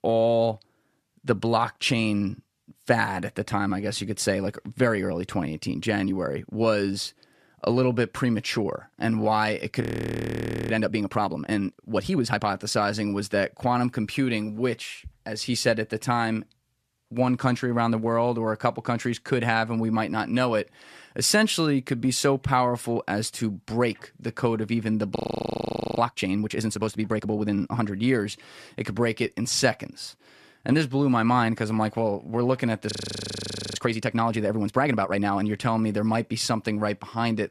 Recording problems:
audio freezing; at 10 s for 1 s, at 25 s for 1 s and at 33 s for 1 s

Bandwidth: 14 kHz